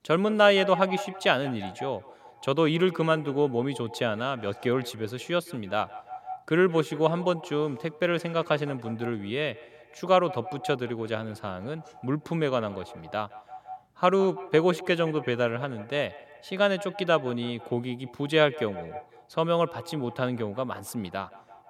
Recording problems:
echo of what is said; noticeable; throughout; 160 ms later, 15 dB below the speech

